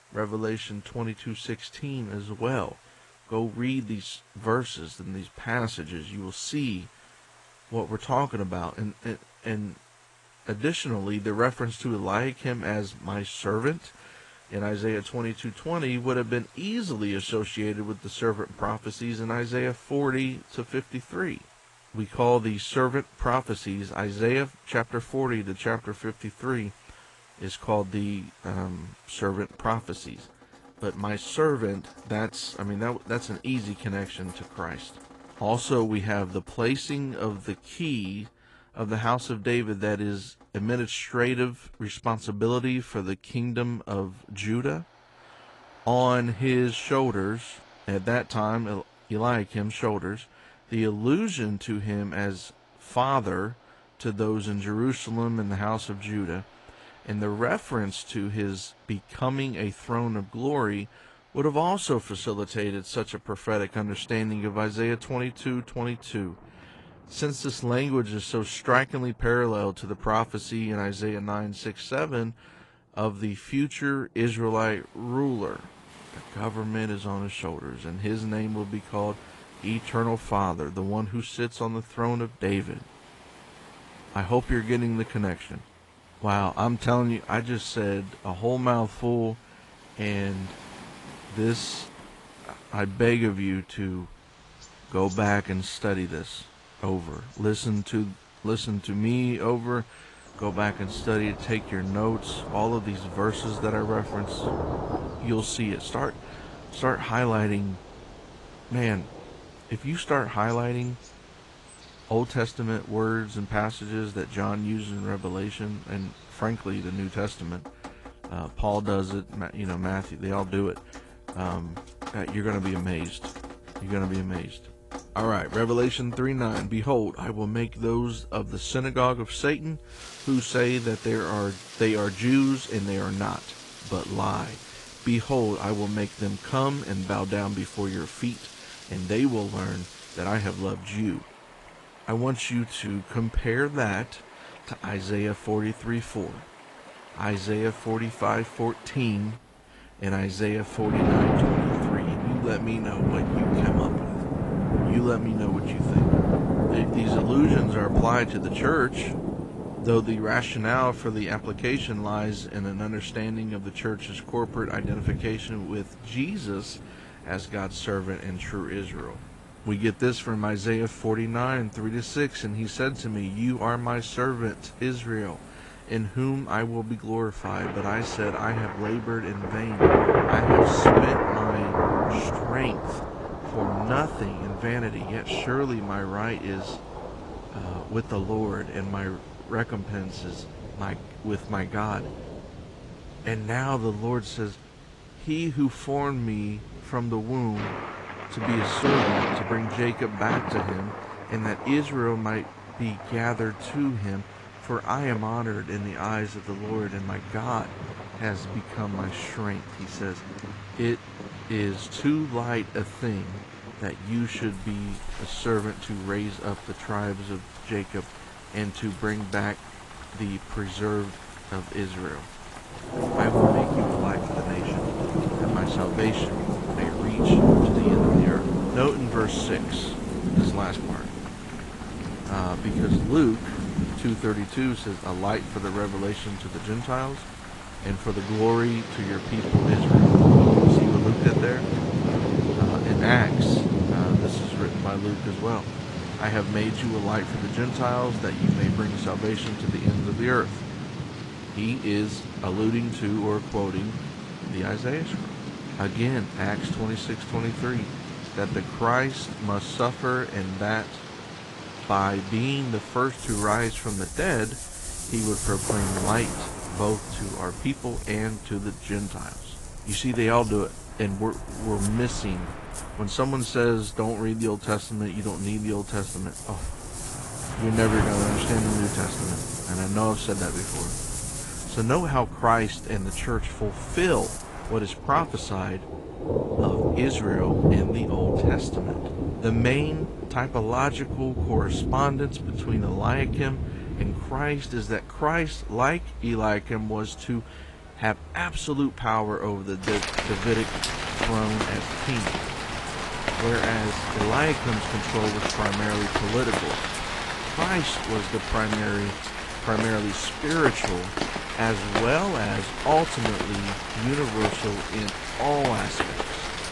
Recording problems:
garbled, watery; slightly
rain or running water; very loud; throughout; as loud as the speech

